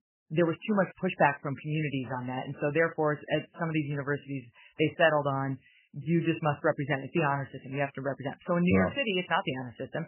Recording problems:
garbled, watery; badly; nothing above 3 kHz

